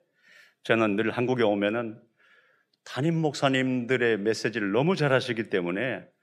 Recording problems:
none

